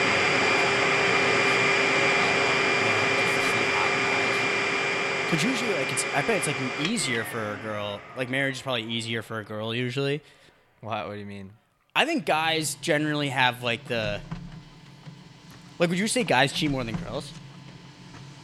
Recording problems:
household noises; very loud; throughout; 5 dB above the speech

